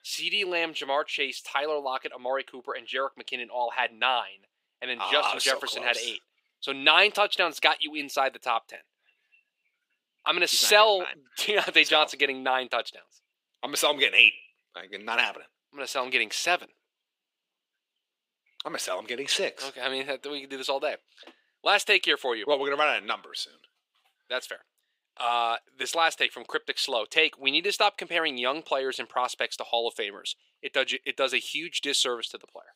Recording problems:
thin; very; fading below 400 Hz

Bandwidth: 15.5 kHz